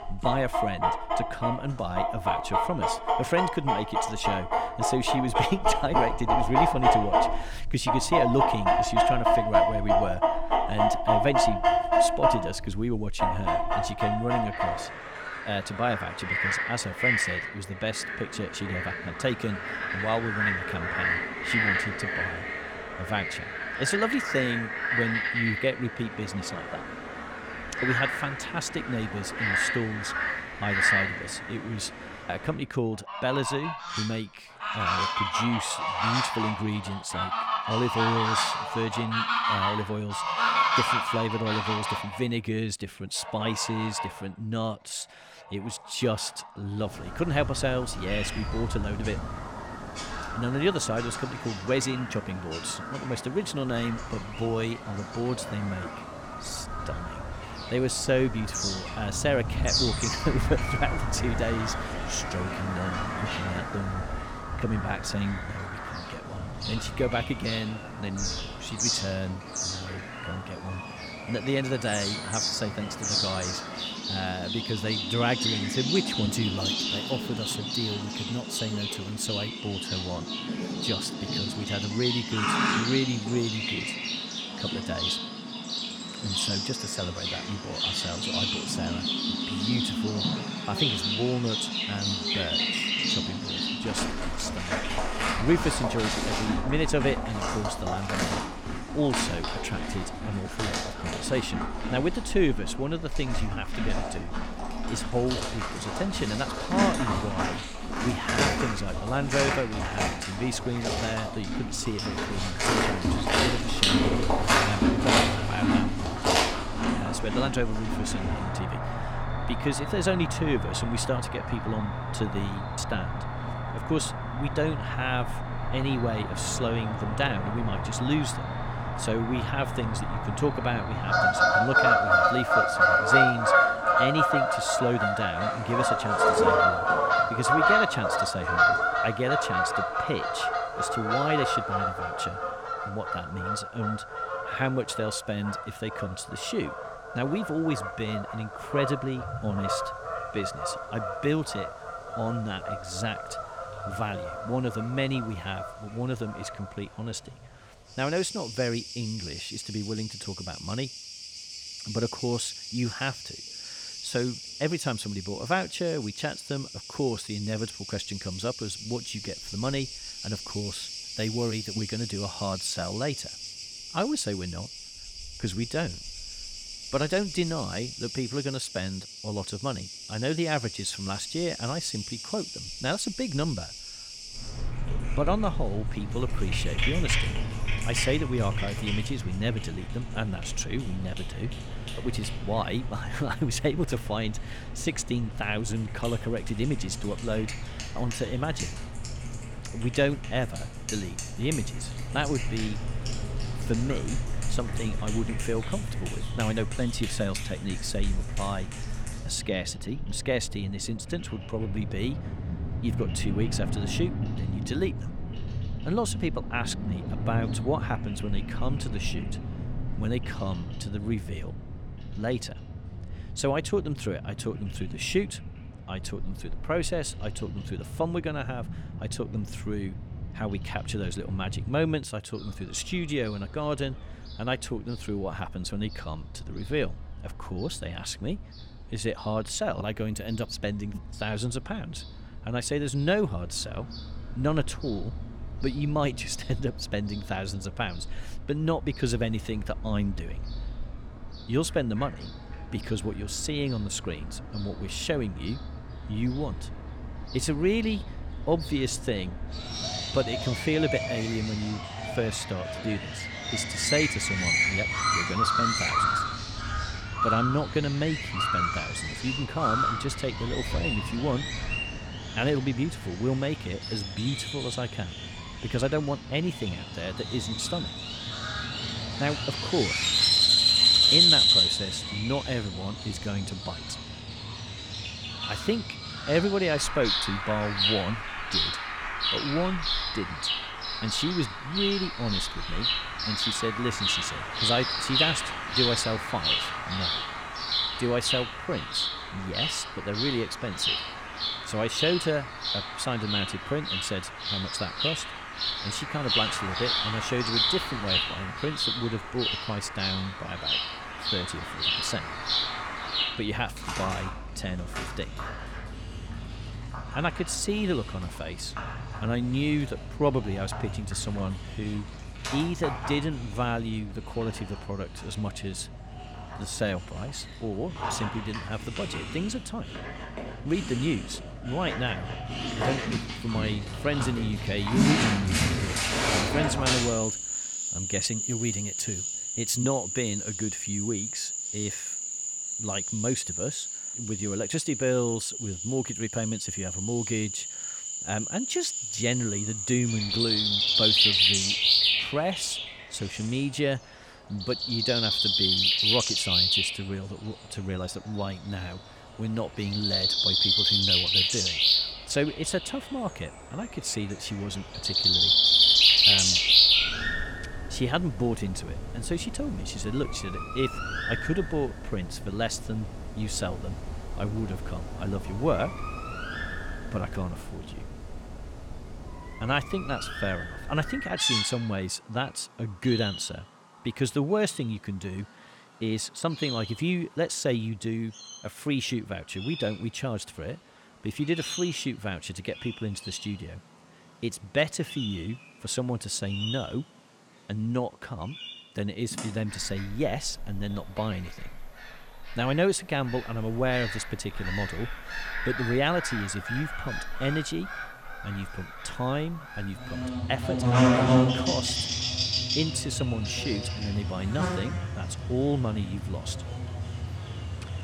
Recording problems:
animal sounds; very loud; throughout; 3 dB above the speech

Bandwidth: 18.5 kHz